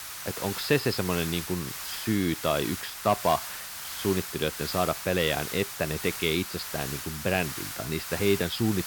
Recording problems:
high frequencies cut off; noticeable; nothing above 5.5 kHz
hiss; loud; throughout; 6 dB below the speech

